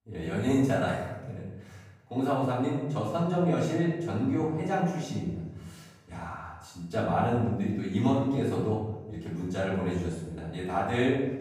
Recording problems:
off-mic speech; far
room echo; noticeable; dies away in 1 s

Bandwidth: 15.5 kHz